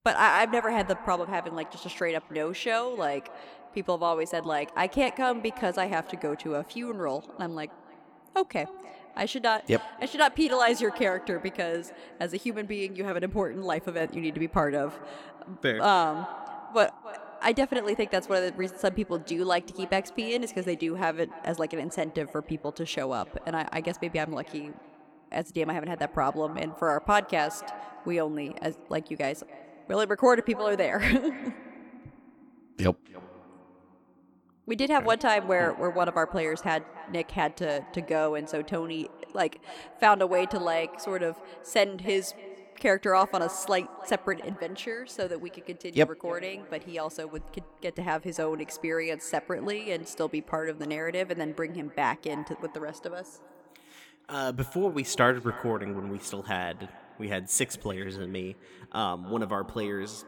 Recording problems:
echo of what is said; noticeable; throughout; 290 ms later, 15 dB below the speech

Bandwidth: 18.5 kHz